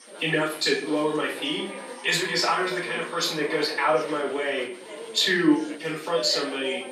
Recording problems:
off-mic speech; far
thin; somewhat; fading below 300 Hz
room echo; slight; dies away in 0.4 s
chatter from many people; noticeable; throughout; 15 dB below the speech
high-pitched whine; faint; throughout; 8.5 kHz, 25 dB below the speech

